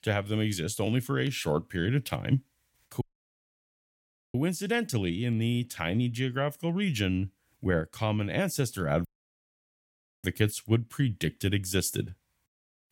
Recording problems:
audio cutting out; at 3 s for 1.5 s and at 9 s for 1 s

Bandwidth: 16.5 kHz